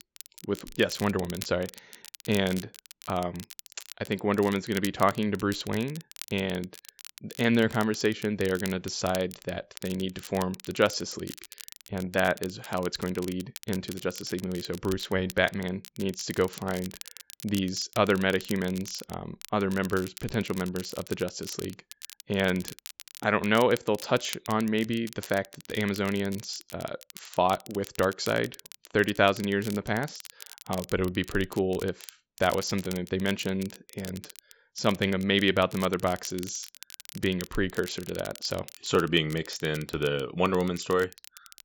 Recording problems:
high frequencies cut off; noticeable; nothing above 7.5 kHz
crackle, like an old record; noticeable; 15 dB below the speech

